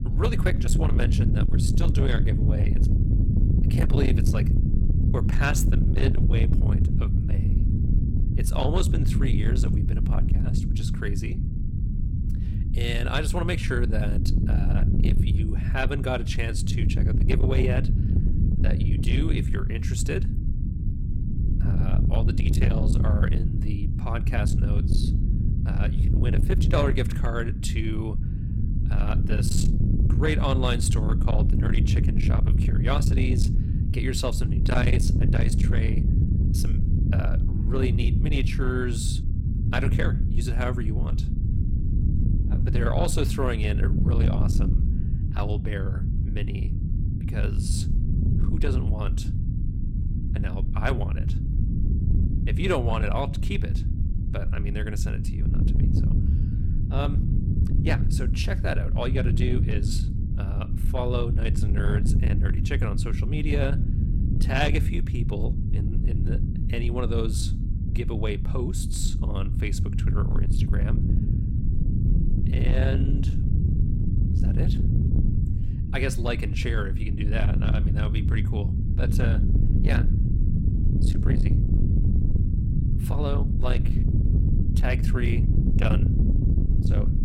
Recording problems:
distortion; slight; 10 dB below the speech
low rumble; loud; throughout; 5 dB below the speech

